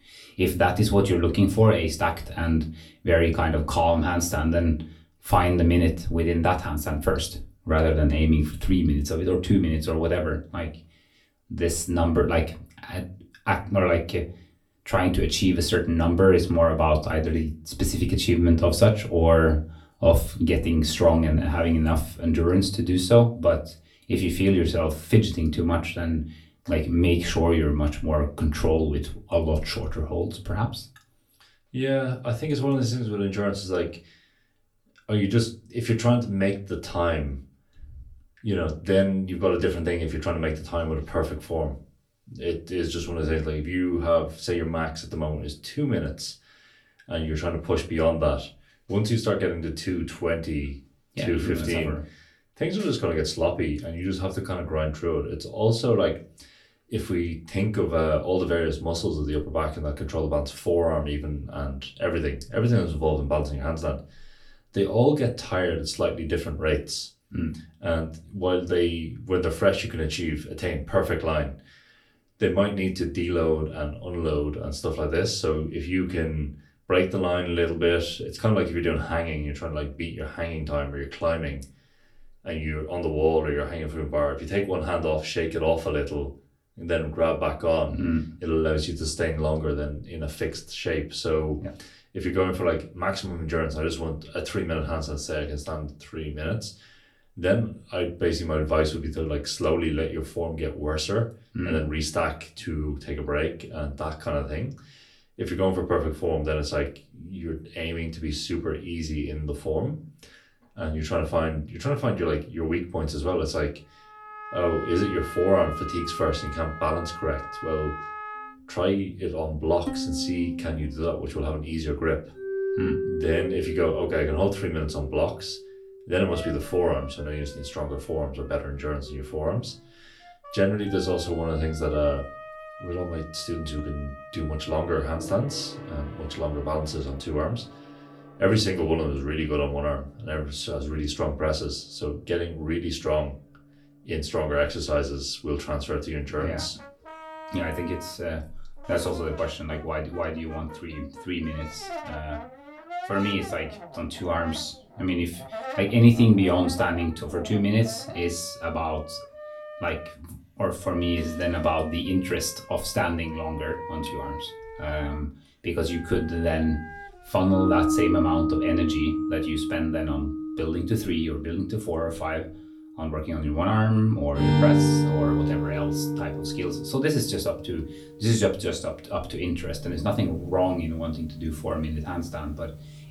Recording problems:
off-mic speech; far
room echo; very slight; dies away in 0.2 s
background music; loud; from 1:54 on; 6 dB below the speech

